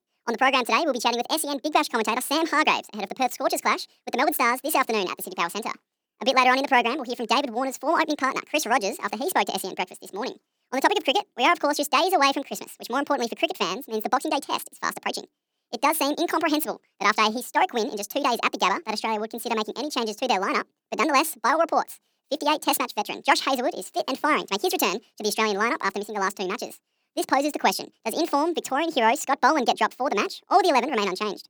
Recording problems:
wrong speed and pitch; too fast and too high; 1.7 times normal speed

